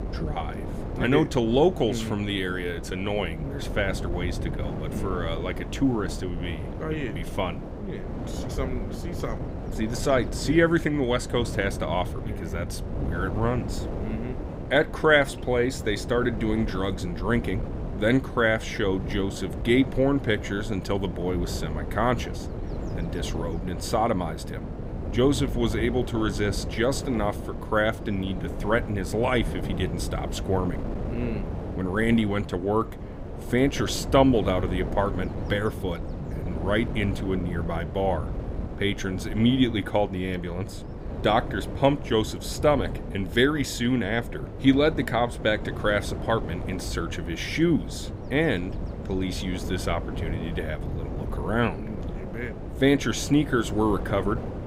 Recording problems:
wind noise on the microphone; occasional gusts; 10 dB below the speech

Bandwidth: 15.5 kHz